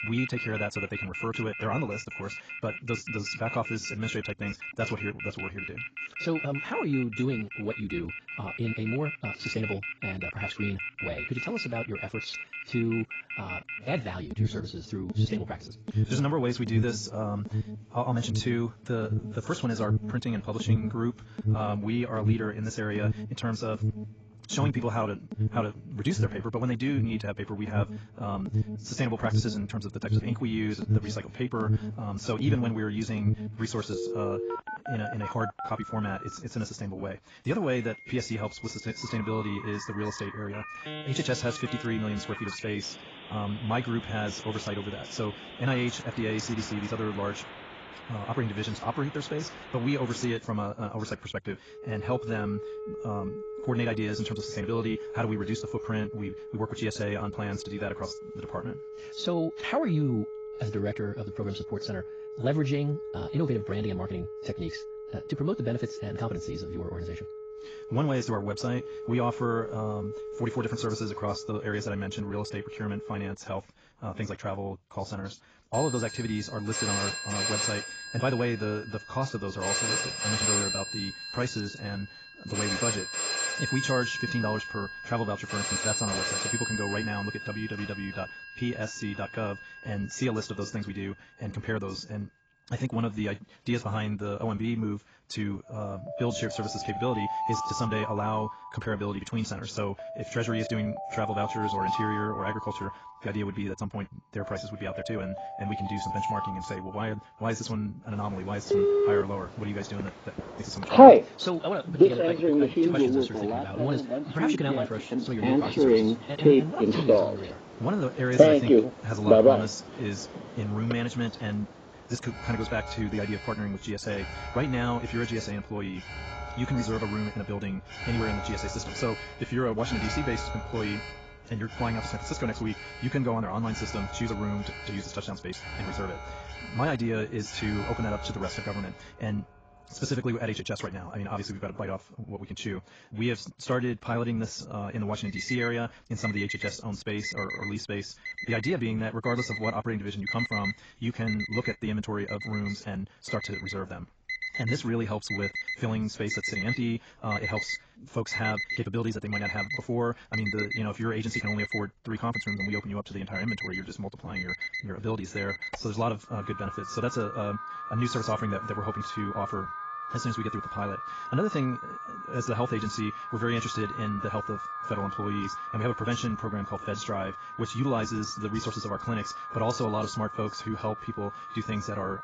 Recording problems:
garbled, watery; badly; nothing above 7.5 kHz
wrong speed, natural pitch; too fast; 1.6 times normal speed
alarms or sirens; very loud; throughout; 2 dB above the speech

